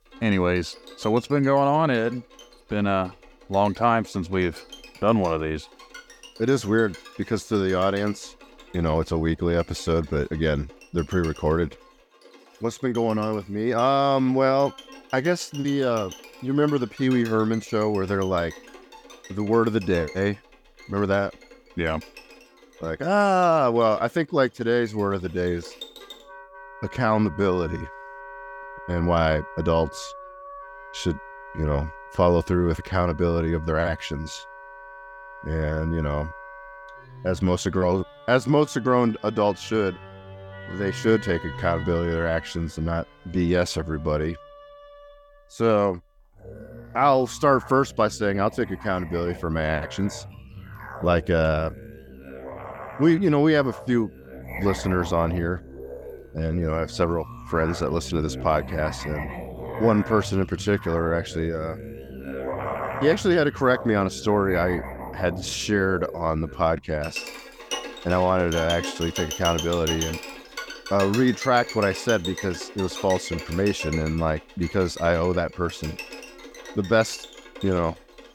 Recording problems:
background music; noticeable; throughout; 15 dB below the speech

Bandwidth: 17.5 kHz